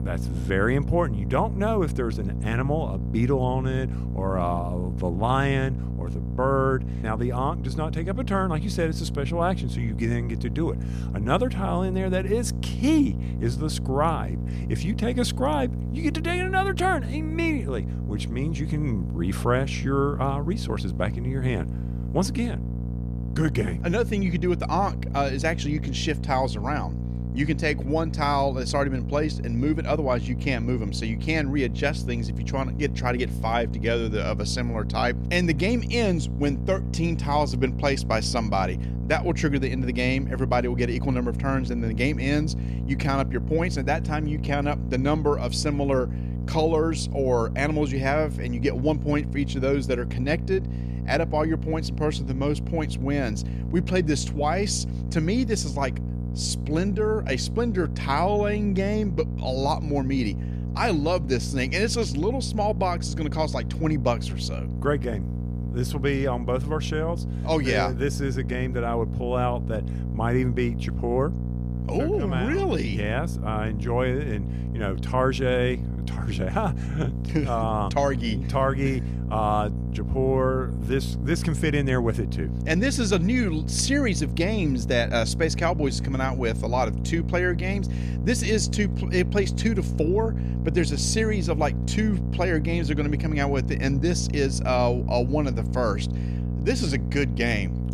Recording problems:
electrical hum; noticeable; throughout; 60 Hz, 15 dB below the speech

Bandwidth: 14.5 kHz